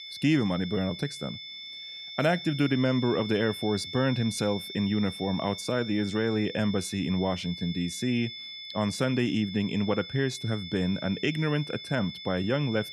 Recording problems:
high-pitched whine; loud; throughout; 3.5 kHz, 10 dB below the speech

